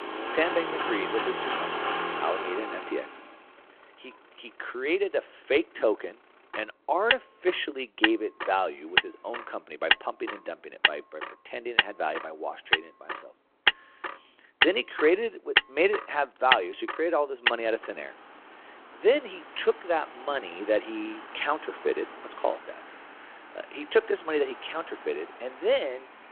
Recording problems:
phone-call audio
traffic noise; very loud; throughout; 1 dB above the speech

